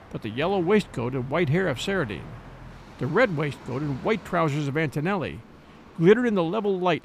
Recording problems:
train or aircraft noise; faint; throughout; 20 dB below the speech

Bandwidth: 15 kHz